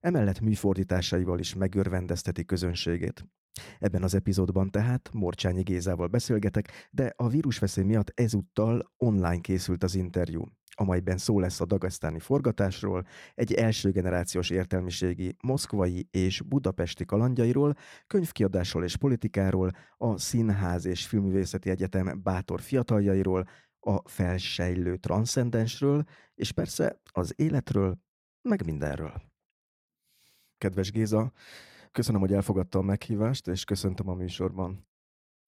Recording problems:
none

